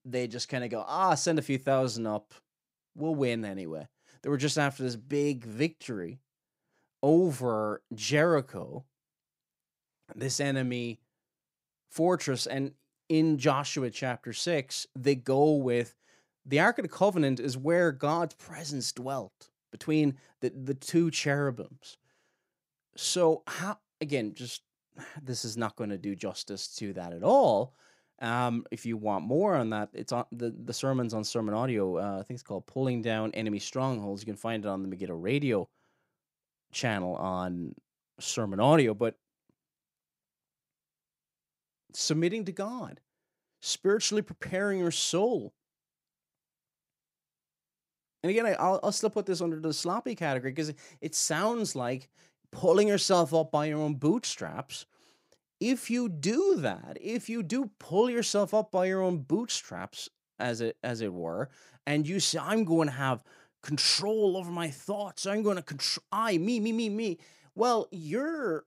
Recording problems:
none

